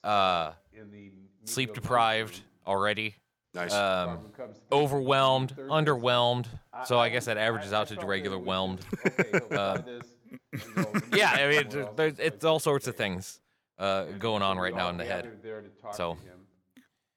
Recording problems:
voice in the background; noticeable; throughout; 15 dB below the speech

